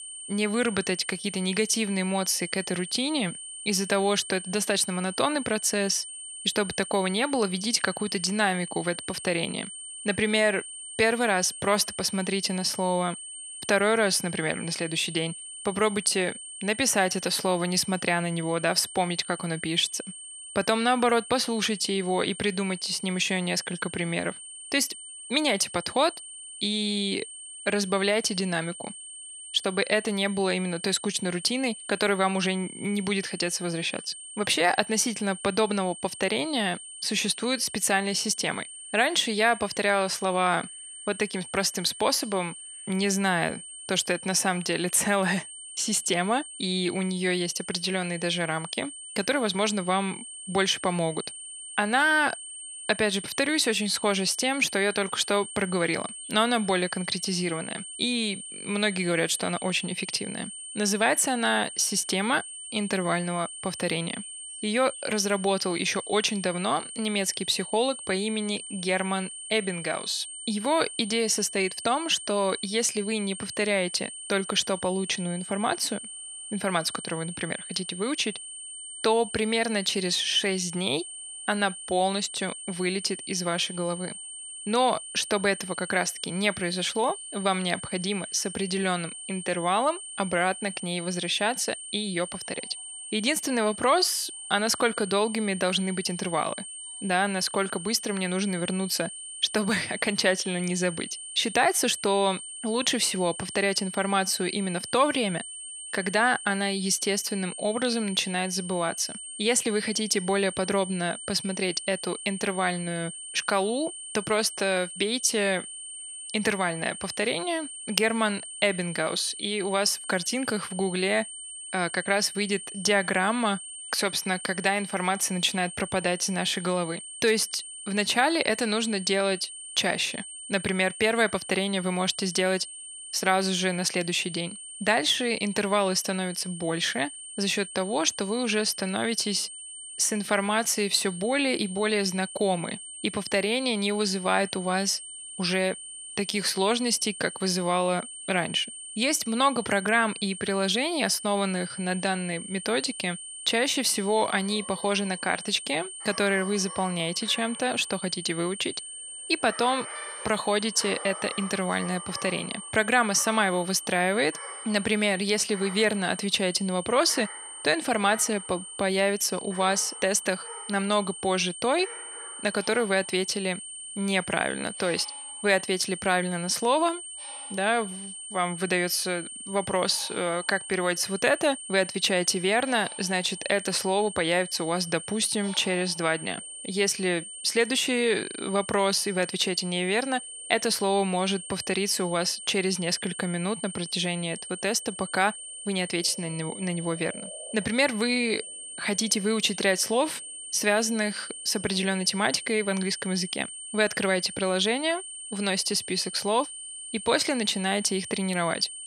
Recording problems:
thin; very slightly; fading below 450 Hz
high-pitched whine; noticeable; throughout; 8.5 kHz, 10 dB below the speech
animal sounds; faint; throughout; 20 dB below the speech

